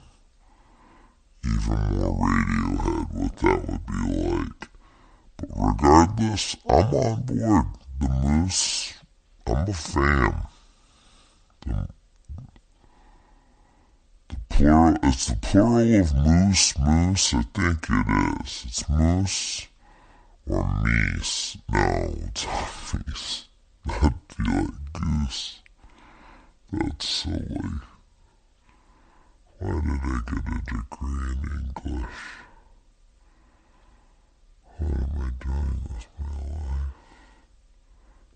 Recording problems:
wrong speed and pitch; too slow and too low; 0.6 times normal speed

